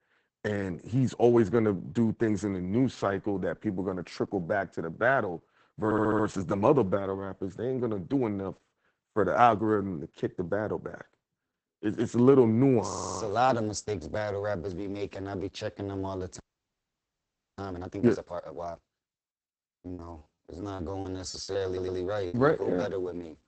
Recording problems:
garbled, watery; badly; nothing above 8 kHz
audio stuttering; at 6 s, at 13 s and at 22 s
audio freezing; at 16 s for 1 s
choppy; very; from 20 to 22 s; 15% of the speech affected

